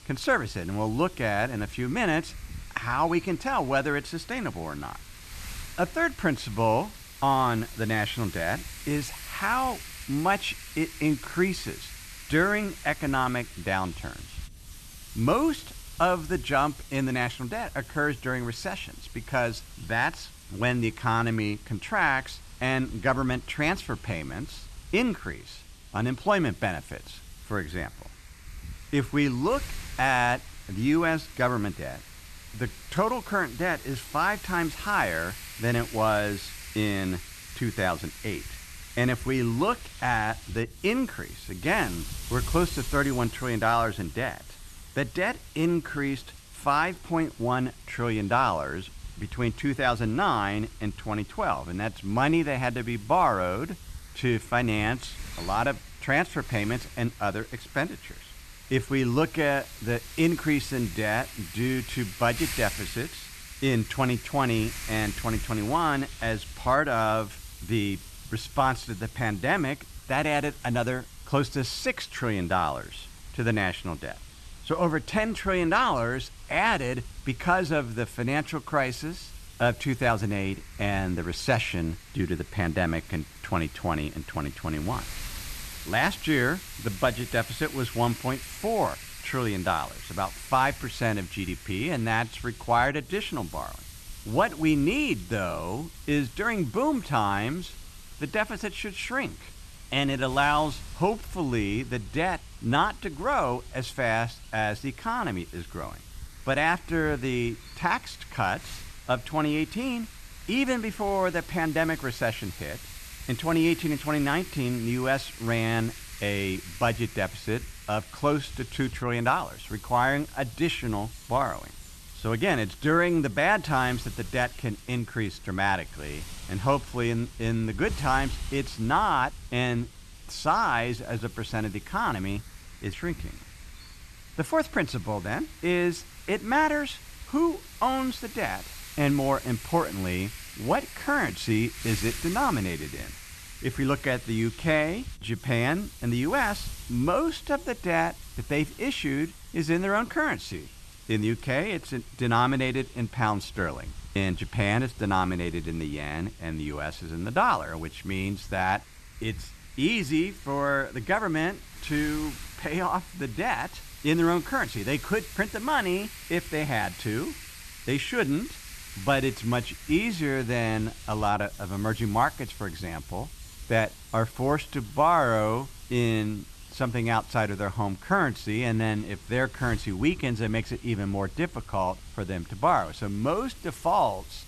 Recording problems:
wind noise on the microphone; occasional gusts; 15 dB below the speech

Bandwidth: 13.5 kHz